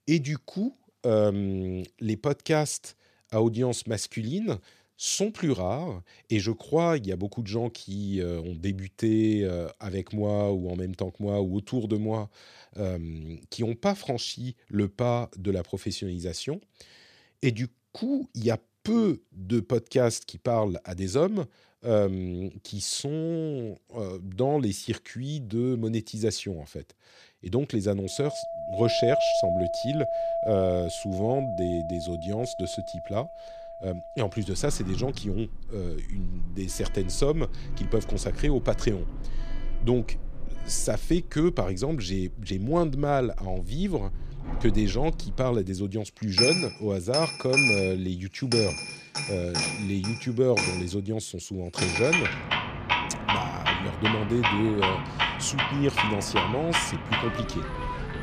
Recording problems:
household noises; loud; from 29 s on; 1 dB below the speech

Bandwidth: 14.5 kHz